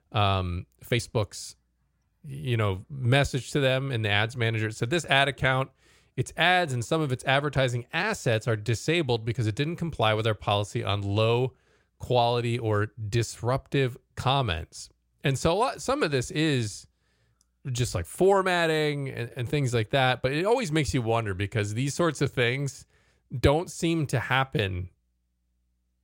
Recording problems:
uneven, jittery; slightly; from 1 to 21 s

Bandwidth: 16 kHz